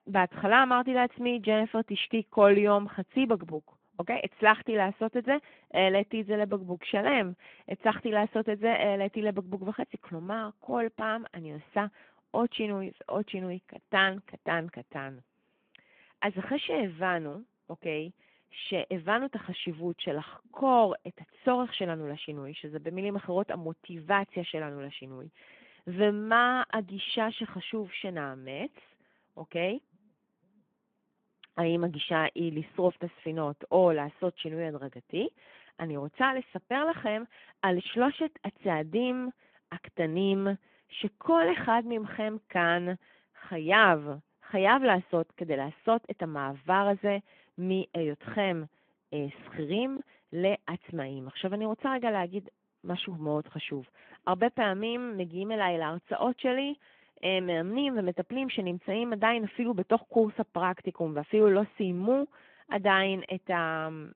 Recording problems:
phone-call audio

